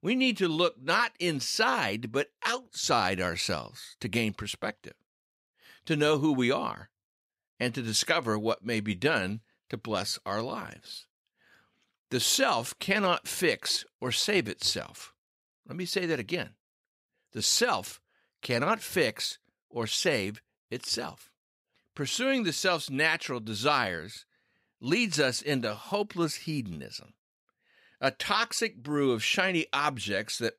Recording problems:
none

